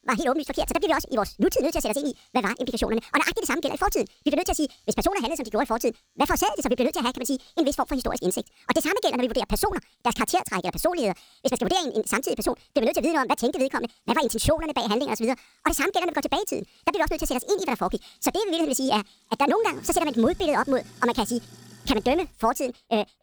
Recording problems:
wrong speed and pitch; too fast and too high; 1.7 times normal speed
household noises; faint; throughout; 30 dB below the speech

